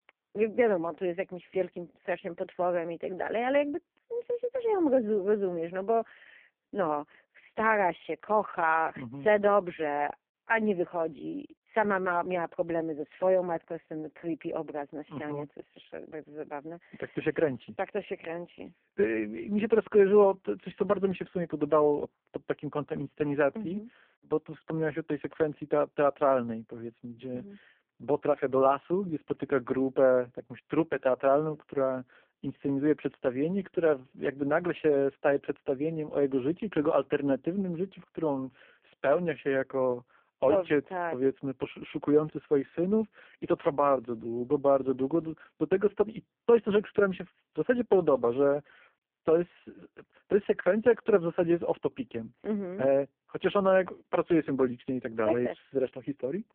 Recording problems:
phone-call audio; poor line

